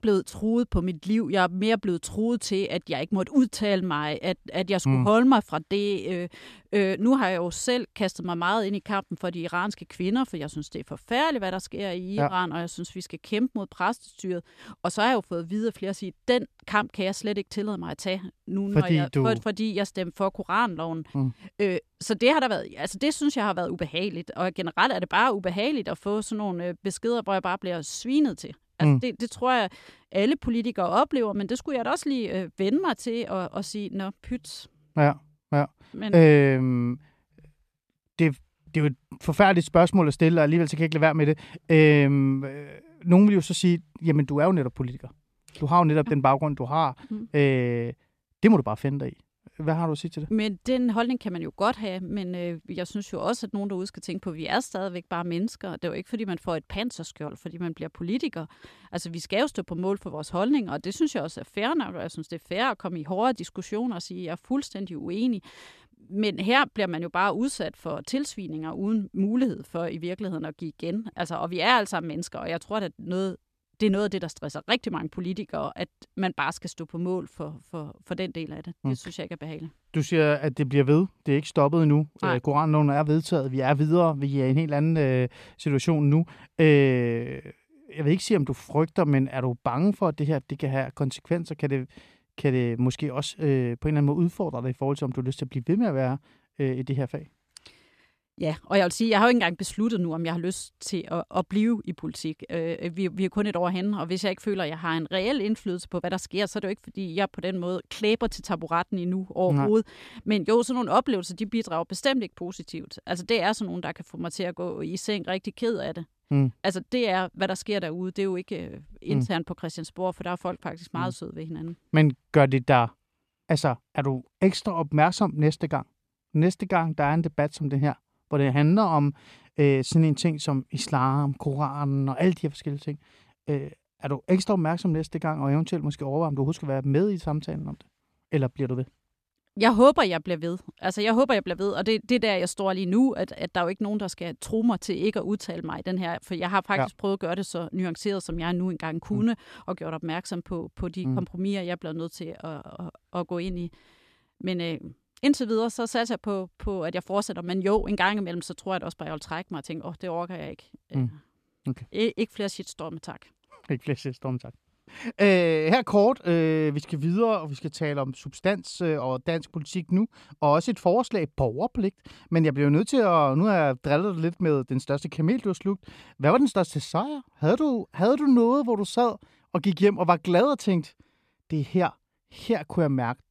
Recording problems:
none

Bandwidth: 14.5 kHz